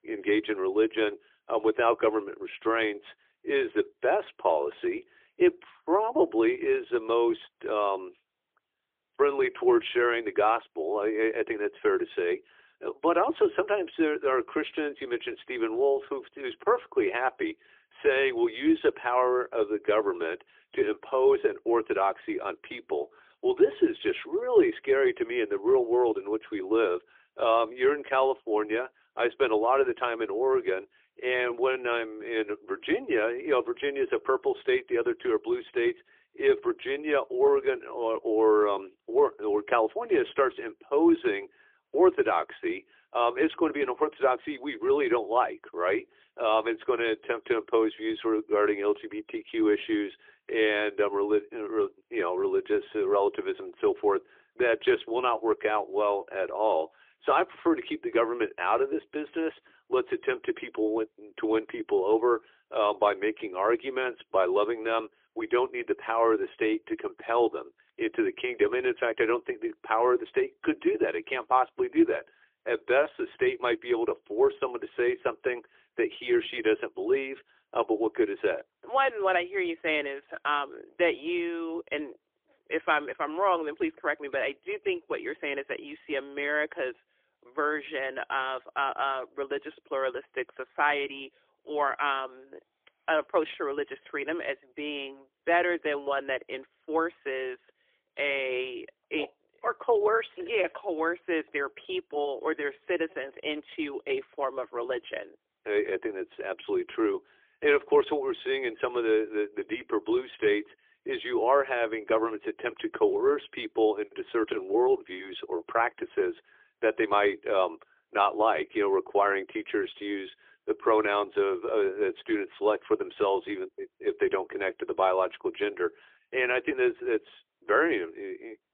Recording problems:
phone-call audio; poor line; nothing above 3.5 kHz

